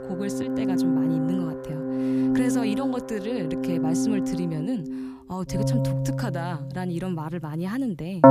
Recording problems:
background music; very loud; throughout; 5 dB above the speech

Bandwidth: 15 kHz